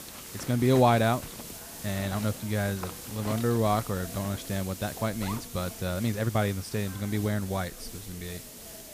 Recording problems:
household noises; noticeable; throughout; 15 dB below the speech
hiss; noticeable; throughout; 10 dB below the speech
background chatter; faint; throughout; 4 voices, 20 dB below the speech
uneven, jittery; strongly; from 2 to 8.5 s

